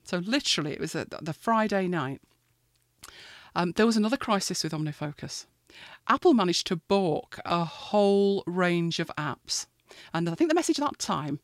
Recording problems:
uneven, jittery; strongly; from 5.5 to 11 s

